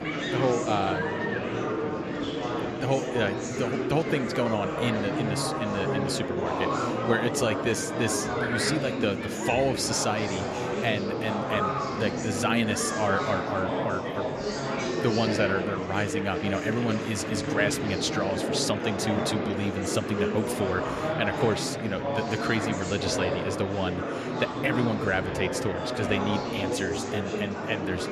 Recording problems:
murmuring crowd; loud; throughout; as loud as the speech

